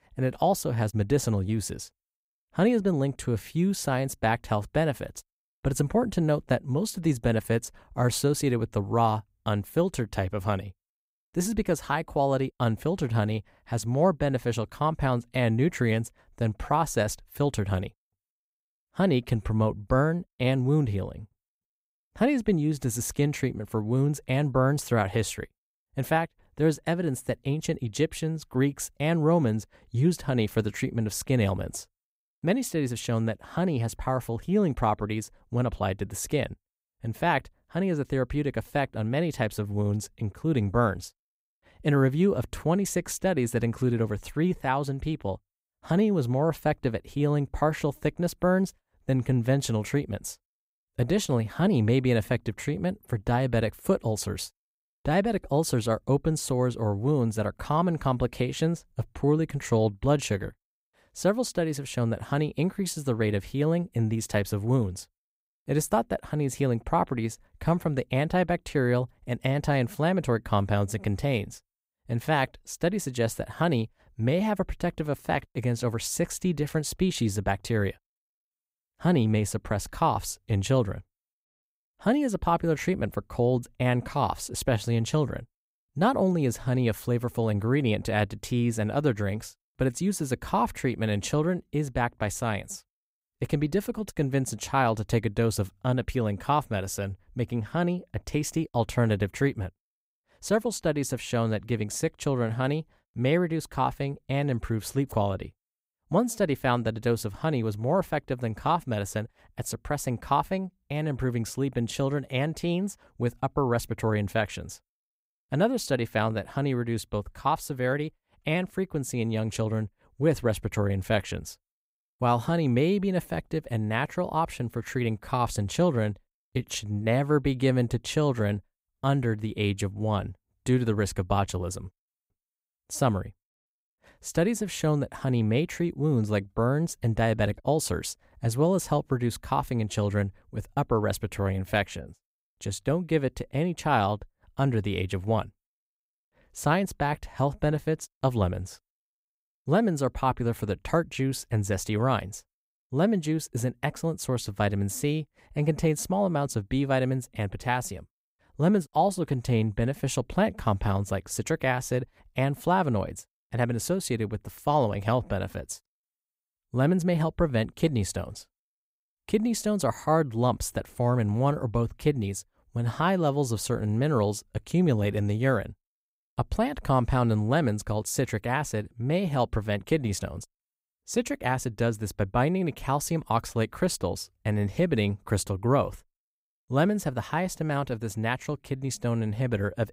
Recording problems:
none

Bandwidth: 15.5 kHz